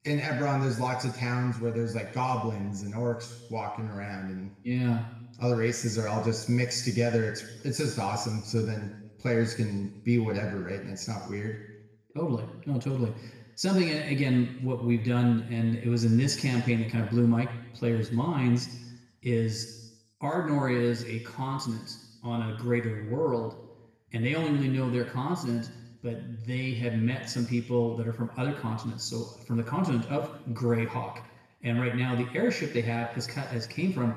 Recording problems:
off-mic speech; far
room echo; noticeable; dies away in 0.9 s

